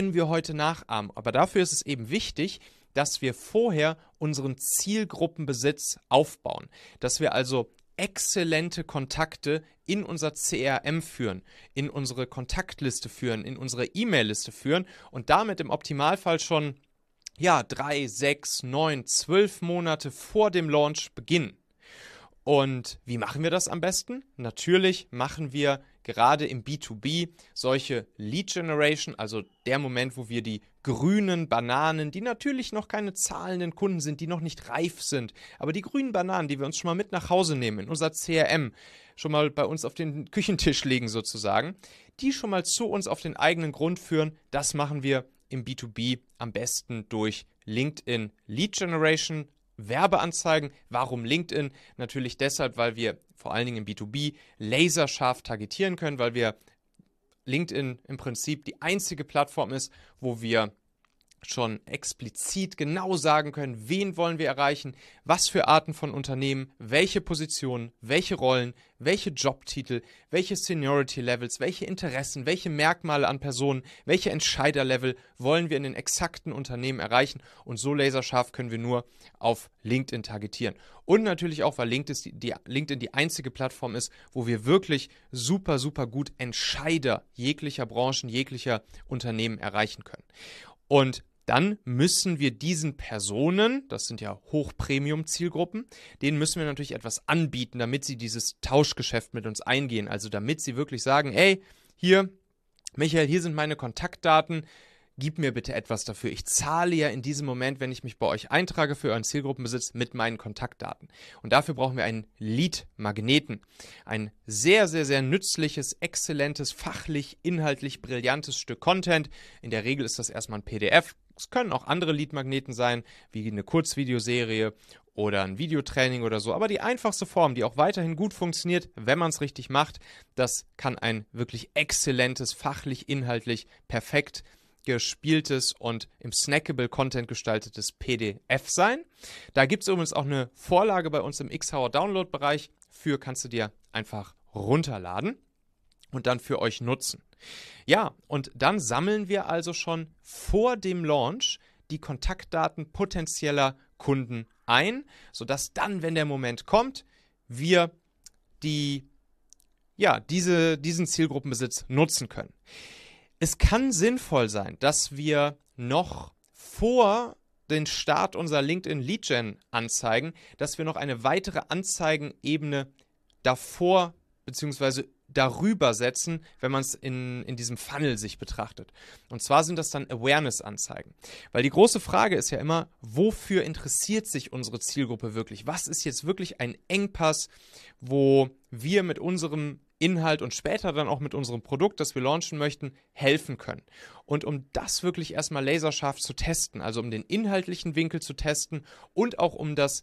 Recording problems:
abrupt cut into speech; at the start

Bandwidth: 13.5 kHz